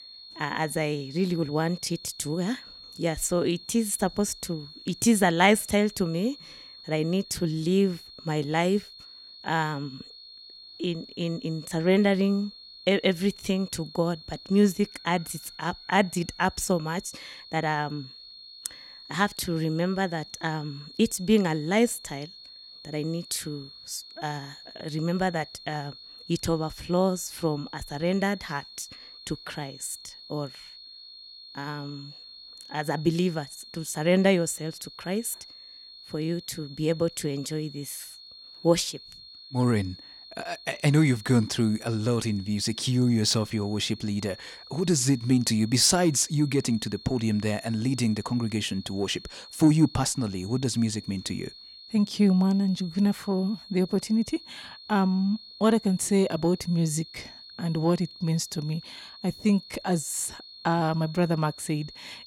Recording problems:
high-pitched whine; noticeable; throughout; 4.5 kHz, 15 dB below the speech

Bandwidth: 18 kHz